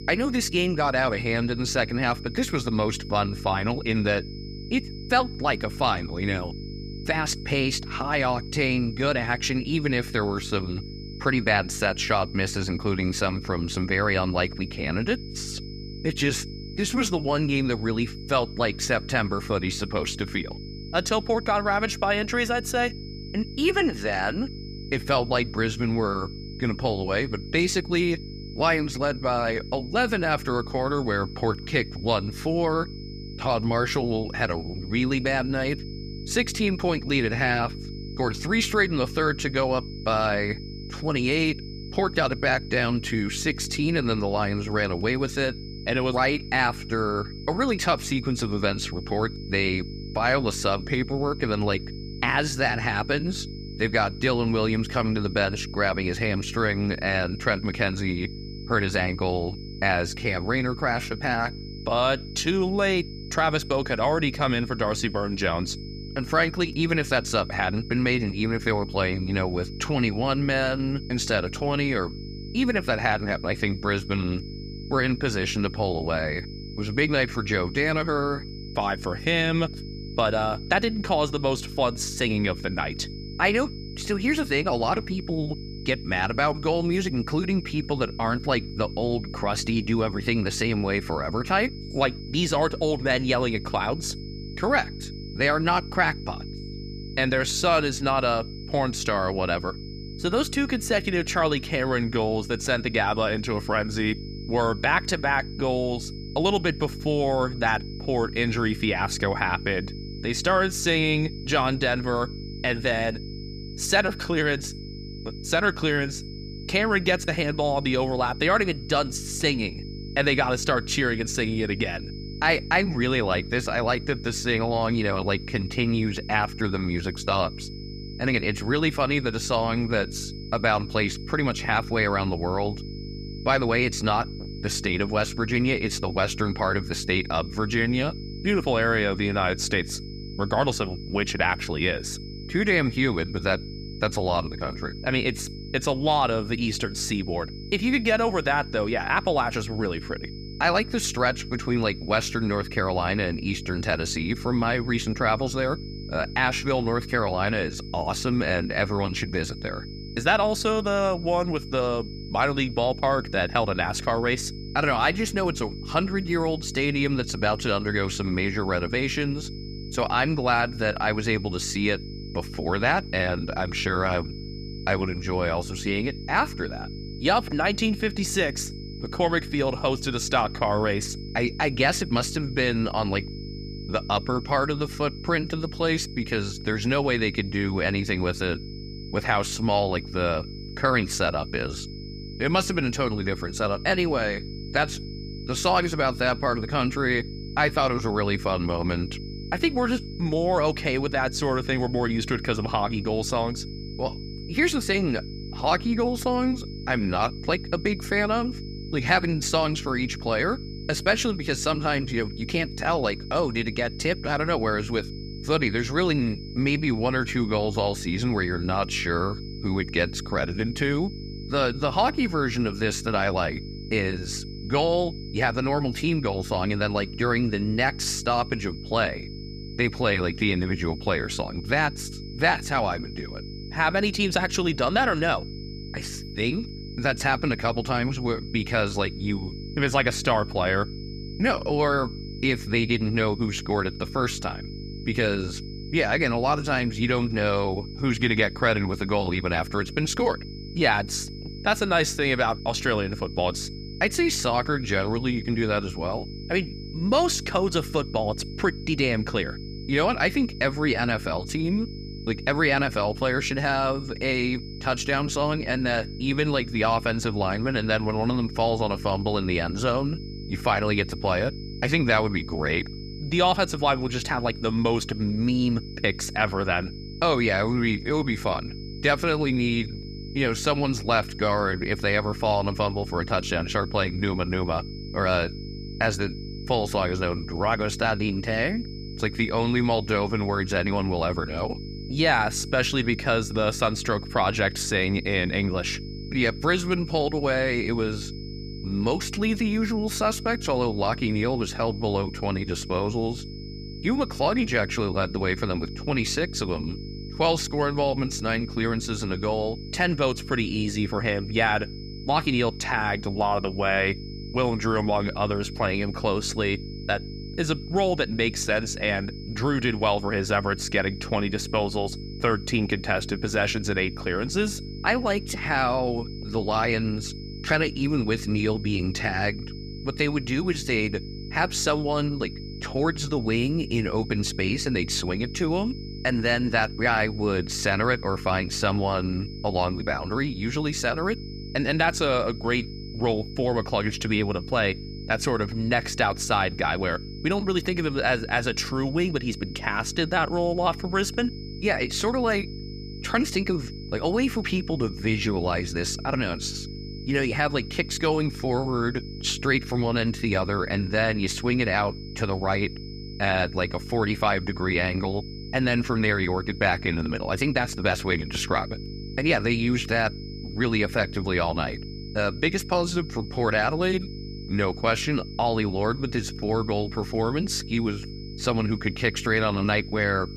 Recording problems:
electrical hum; noticeable; throughout; 50 Hz, 20 dB below the speech
high-pitched whine; noticeable; throughout; 5 kHz, 20 dB below the speech

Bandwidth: 14.5 kHz